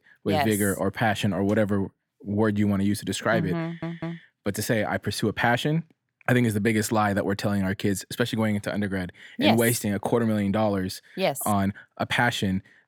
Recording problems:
audio stuttering; at 3.5 s

